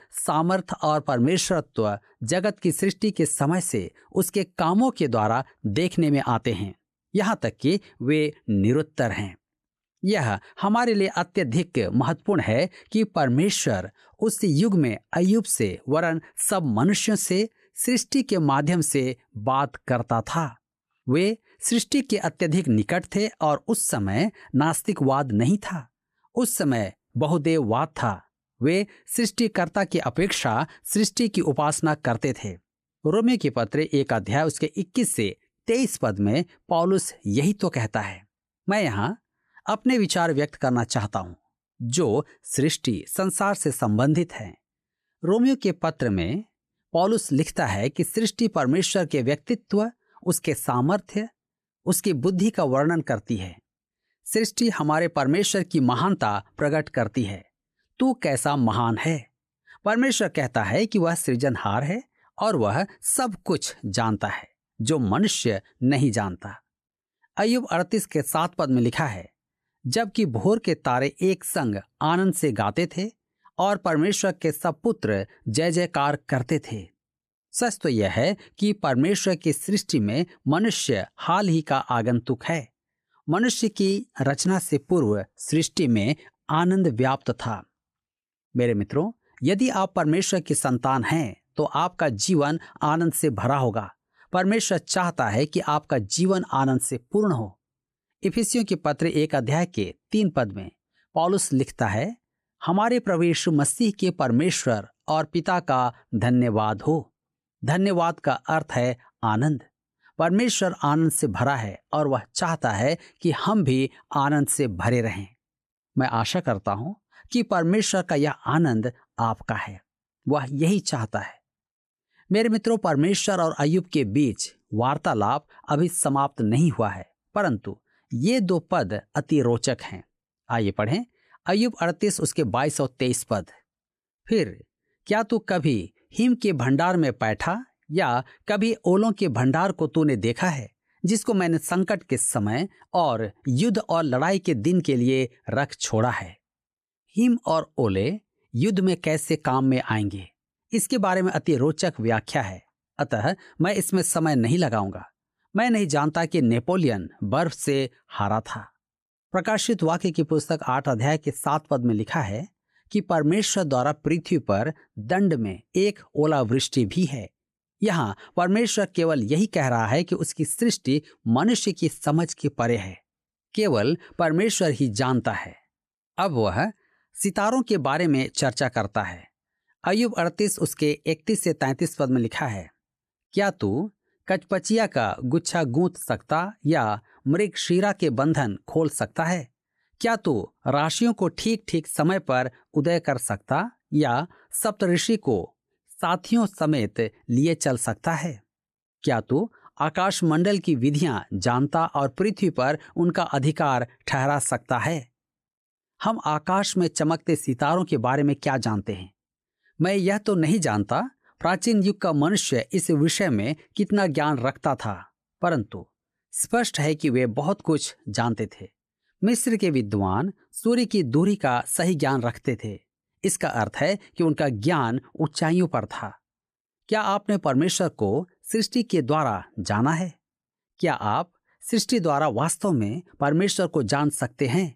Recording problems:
none

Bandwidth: 14.5 kHz